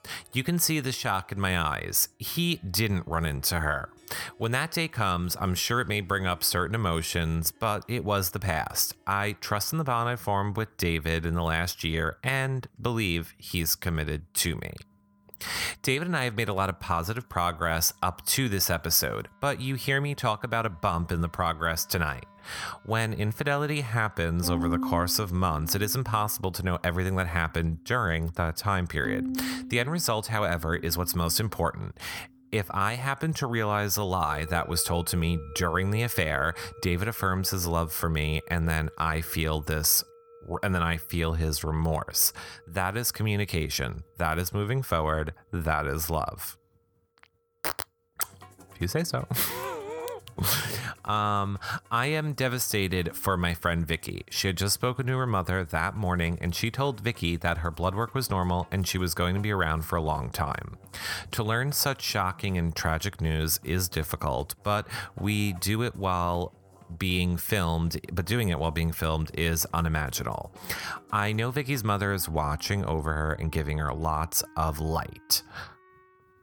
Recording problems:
background music; noticeable; throughout; 20 dB below the speech

